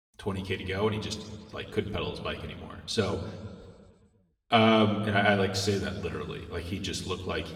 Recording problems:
room echo; slight; dies away in 1.5 s
off-mic speech; somewhat distant

